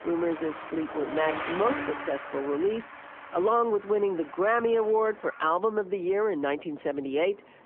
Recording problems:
phone-call audio; nothing above 3 kHz
traffic noise; noticeable; throughout; 10 dB below the speech

